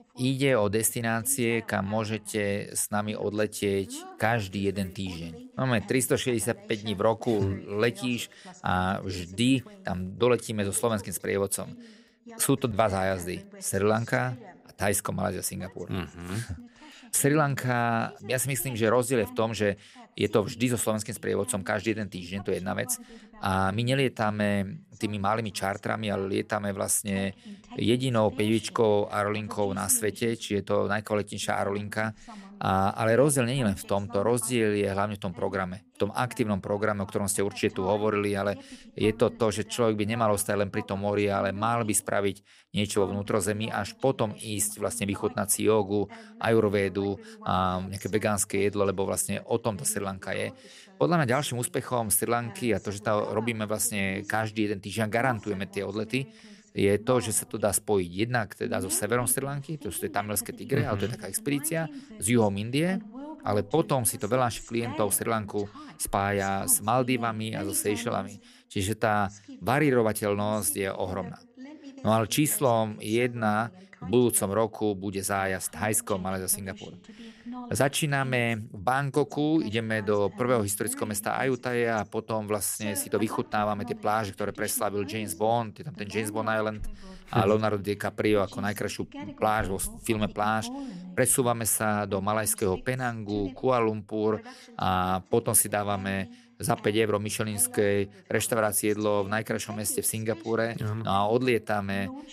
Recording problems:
voice in the background; noticeable; throughout; 20 dB below the speech

